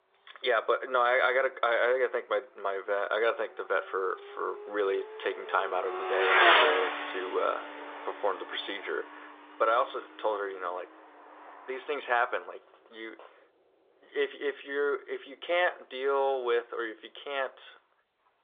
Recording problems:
phone-call audio
traffic noise; very loud; throughout; 2 dB above the speech

